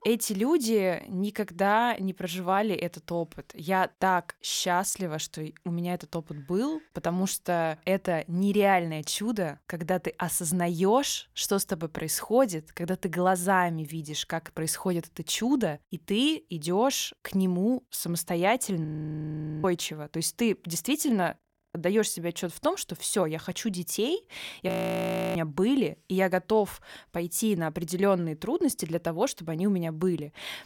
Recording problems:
audio freezing; at 19 s for 1 s, at 21 s and at 25 s for 0.5 s

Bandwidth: 17 kHz